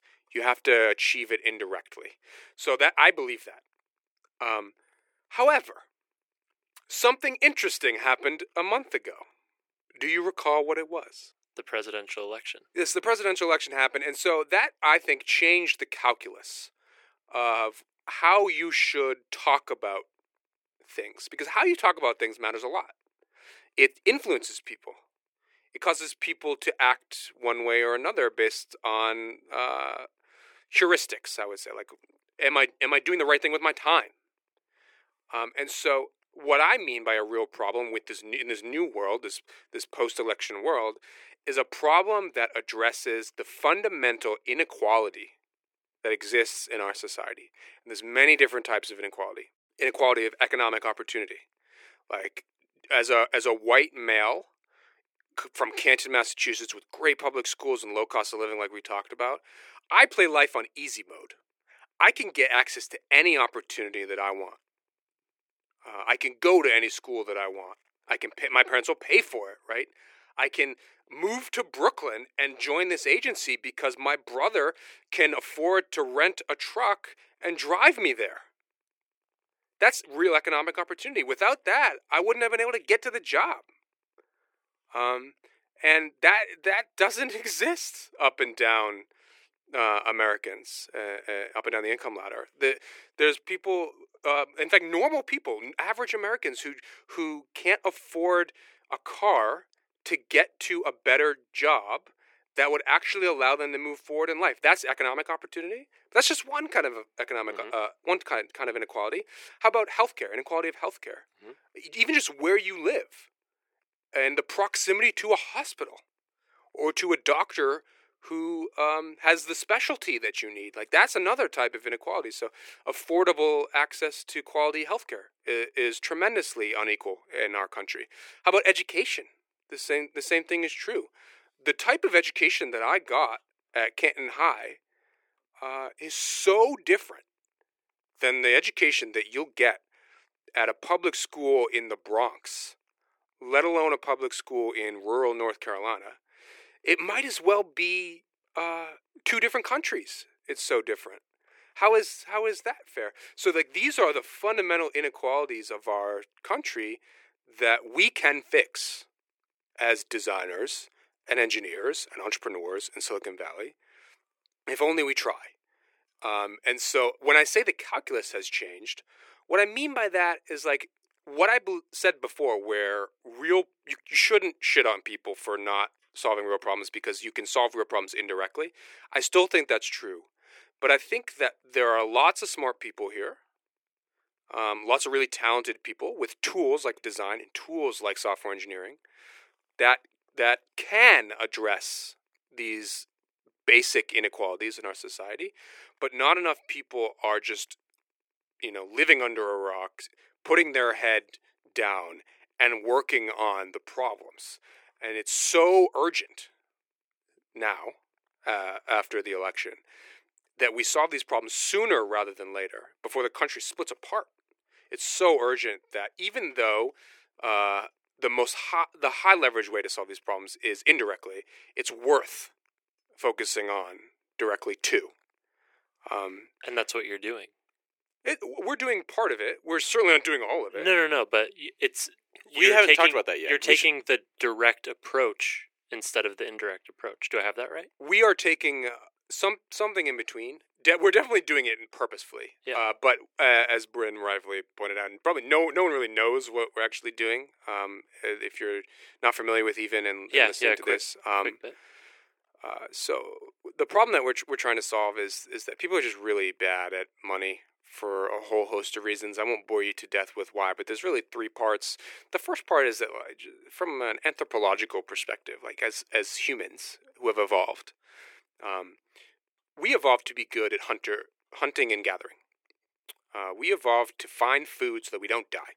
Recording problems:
thin; very; fading below 350 Hz

